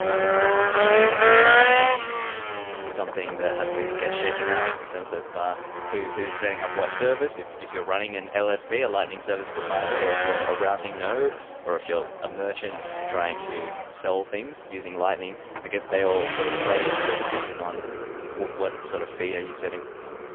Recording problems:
phone-call audio; poor line; nothing above 3 kHz
traffic noise; very loud; throughout; 5 dB above the speech

